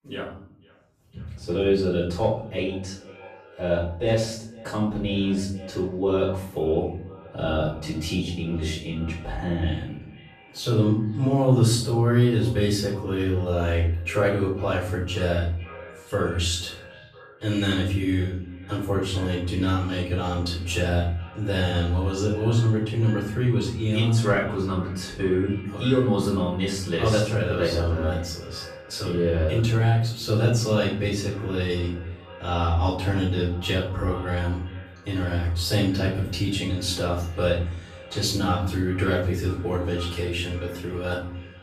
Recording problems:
off-mic speech; far
room echo; noticeable; dies away in 0.7 s
echo of what is said; faint; throughout; 500 ms later, 20 dB below the speech

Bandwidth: 14.5 kHz